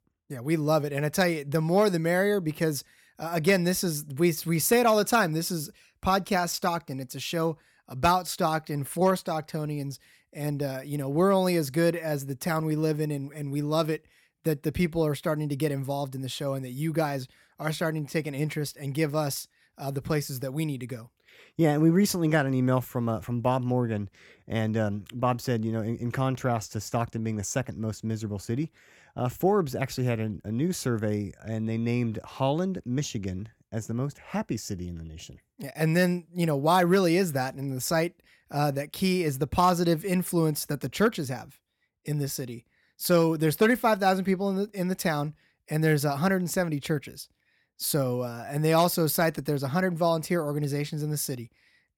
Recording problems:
none

